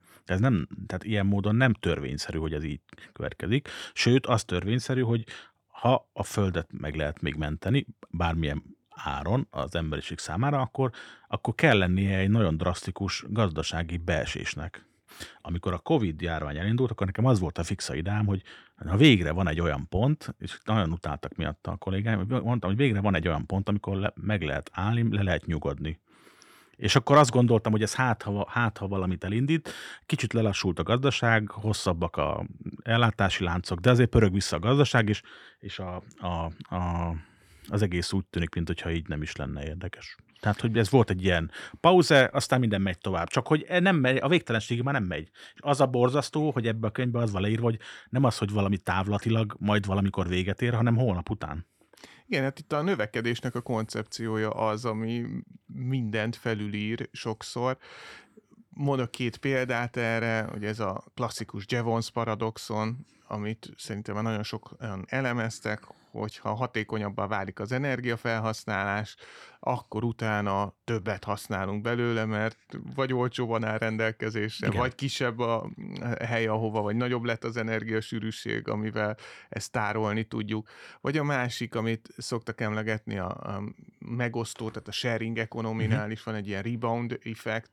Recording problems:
none

